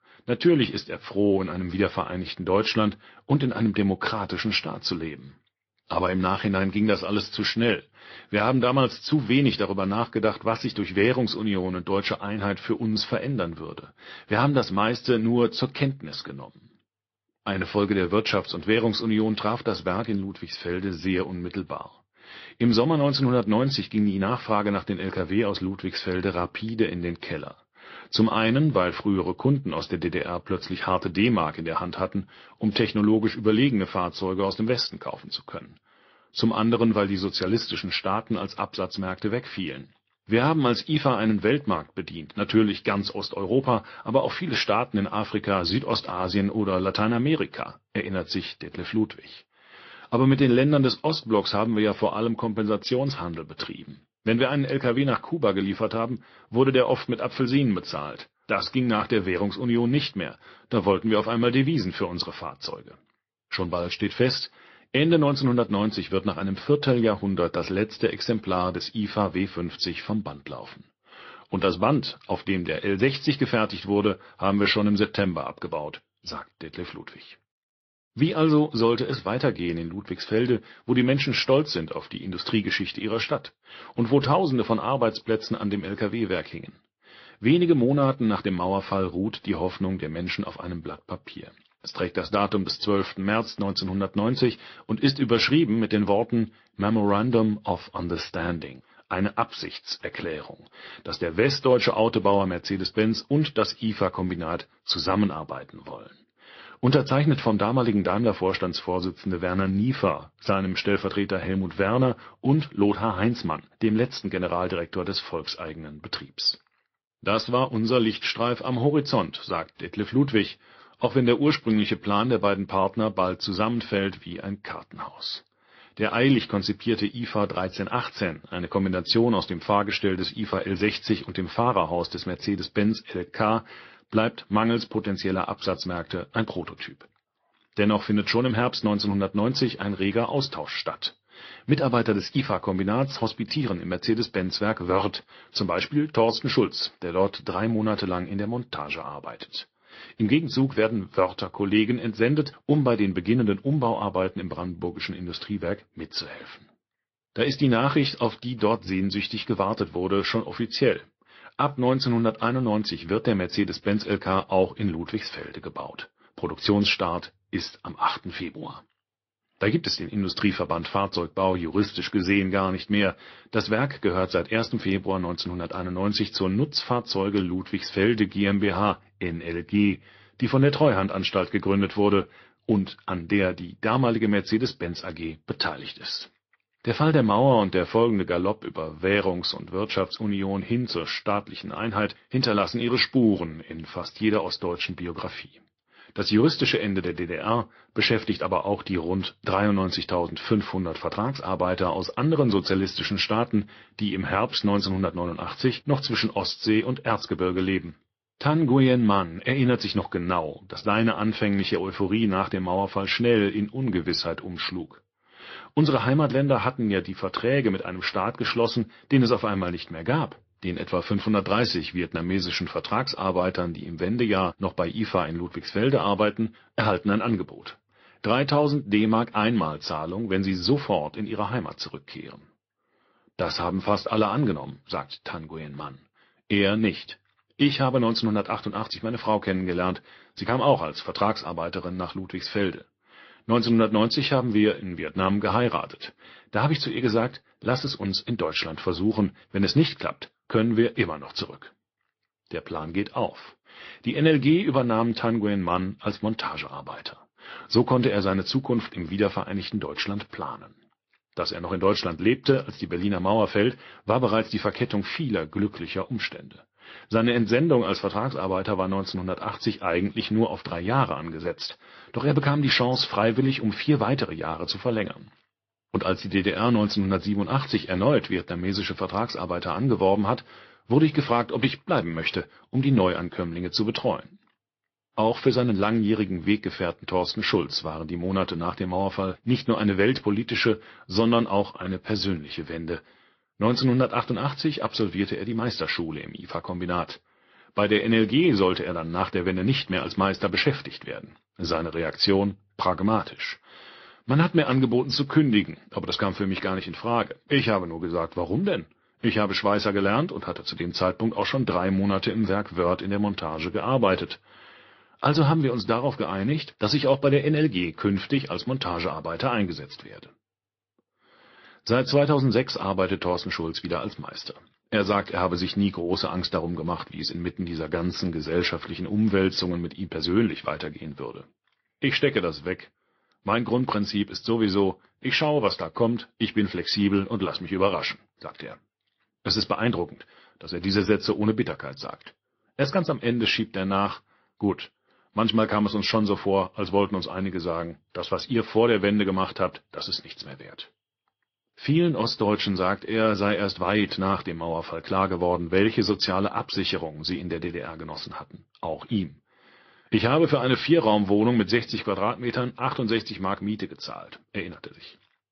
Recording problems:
high frequencies cut off; noticeable; nothing above 5.5 kHz
garbled, watery; slightly

